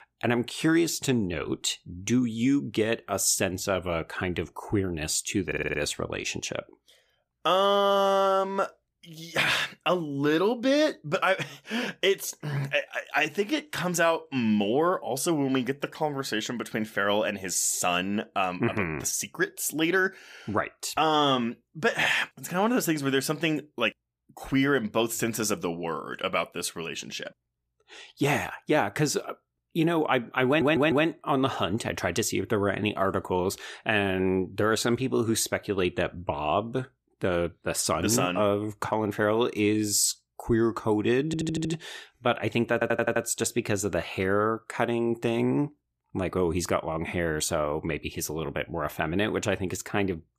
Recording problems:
audio stuttering; 4 times, first at 5.5 s

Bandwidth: 15 kHz